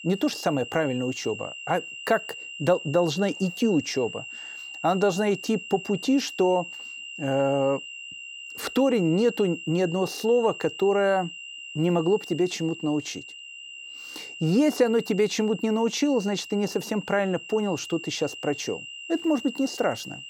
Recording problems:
high-pitched whine; noticeable; throughout; 3 kHz, 10 dB below the speech

